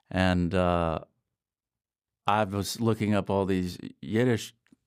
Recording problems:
none

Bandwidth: 15.5 kHz